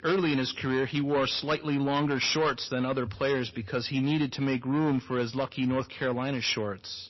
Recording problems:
distortion; slight; 9% of the sound clipped
garbled, watery; slightly; nothing above 6 kHz

